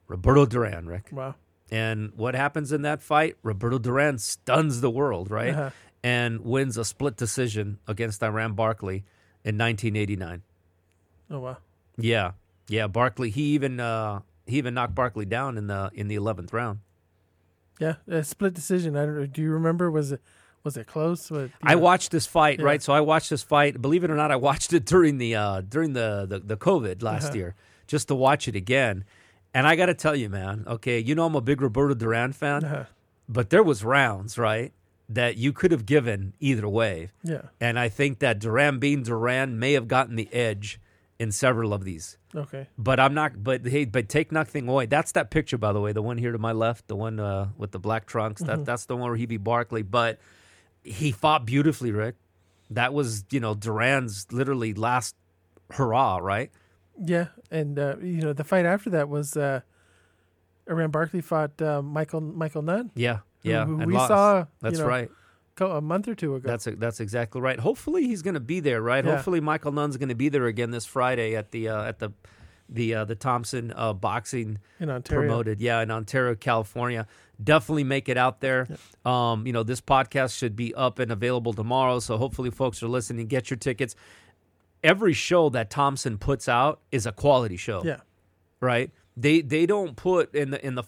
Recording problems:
none

